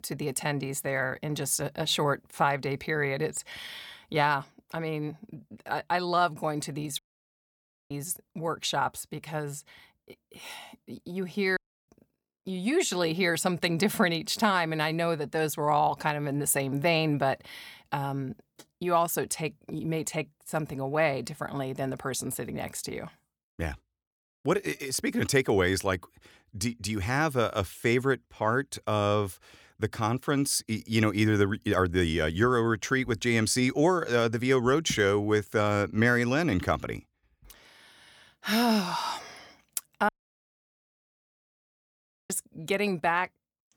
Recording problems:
audio cutting out; at 7 s for 1 s, at 12 s and at 40 s for 2 s

